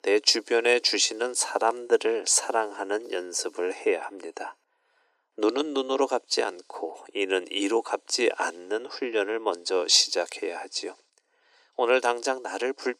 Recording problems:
thin; very; fading below 300 Hz

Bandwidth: 14.5 kHz